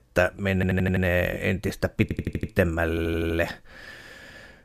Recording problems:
audio stuttering; at 0.5 s, at 2 s and at 3 s

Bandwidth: 15 kHz